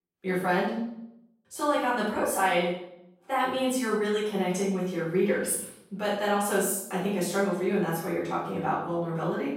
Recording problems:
off-mic speech; far
room echo; noticeable; dies away in 0.6 s

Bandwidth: 16 kHz